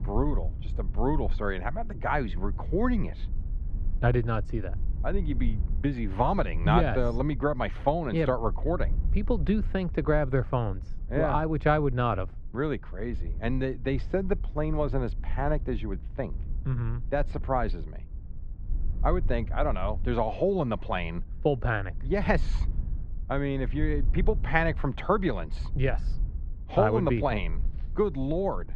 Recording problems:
muffled; very; fading above 2 kHz
low rumble; faint; throughout; 25 dB below the speech

